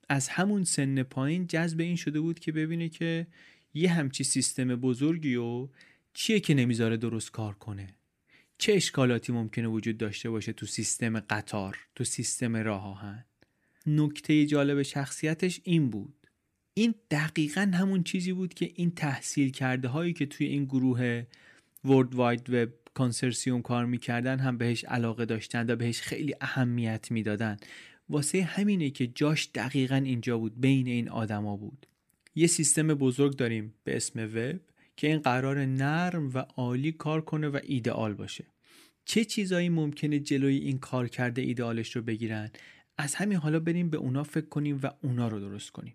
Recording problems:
none

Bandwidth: 15 kHz